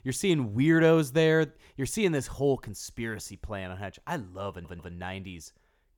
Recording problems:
audio stuttering; at 4.5 s

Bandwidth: 19 kHz